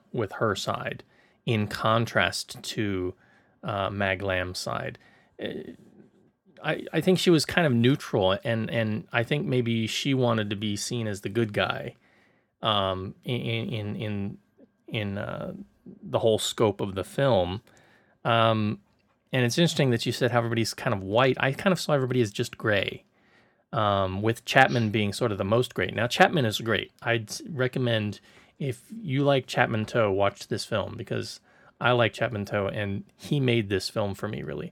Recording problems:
none

